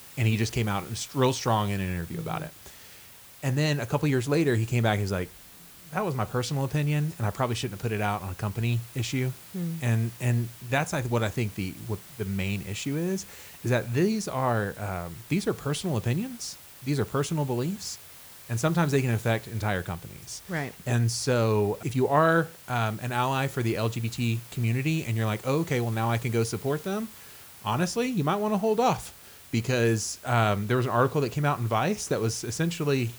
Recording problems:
hiss; noticeable; throughout; 20 dB below the speech

